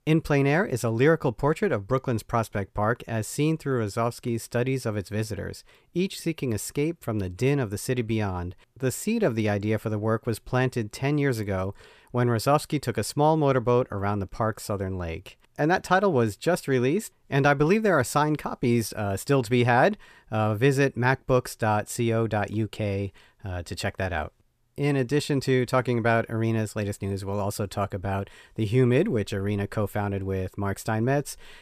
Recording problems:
none

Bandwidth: 14.5 kHz